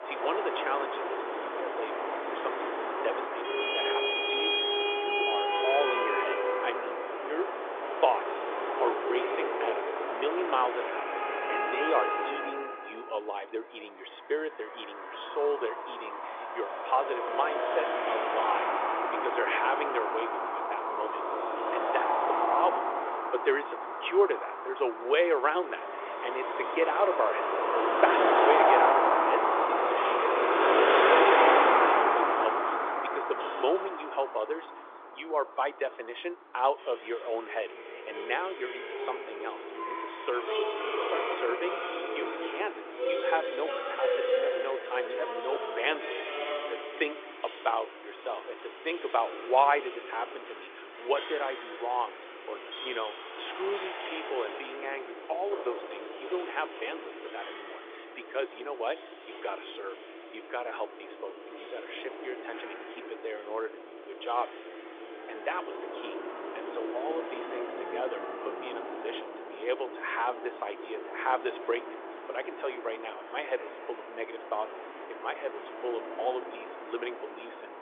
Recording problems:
phone-call audio; nothing above 3.5 kHz
traffic noise; very loud; throughout; 3 dB above the speech

